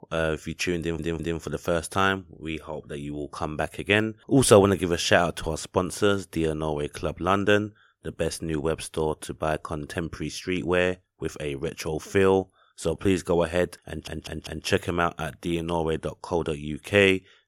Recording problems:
audio stuttering; at 1 s and at 14 s

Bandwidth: 16.5 kHz